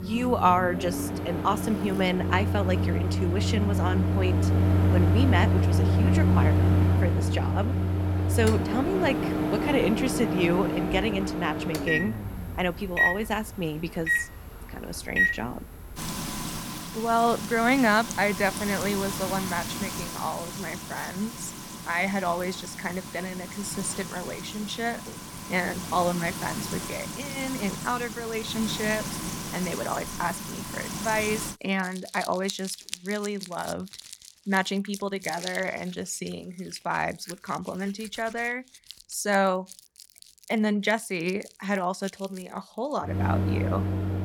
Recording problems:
household noises; very loud; throughout; as loud as the speech

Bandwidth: 18.5 kHz